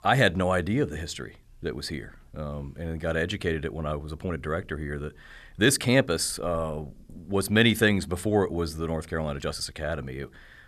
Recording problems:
uneven, jittery; slightly; from 4 to 9.5 s

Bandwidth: 13.5 kHz